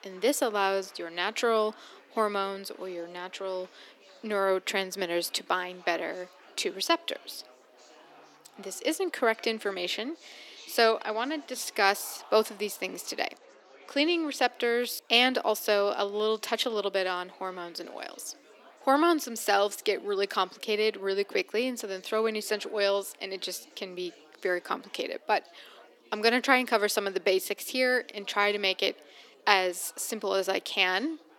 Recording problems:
thin; somewhat; fading below 300 Hz
chatter from many people; faint; throughout; 25 dB below the speech

